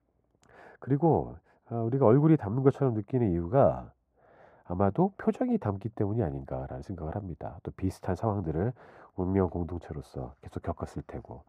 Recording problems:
muffled; very; fading above 2 kHz

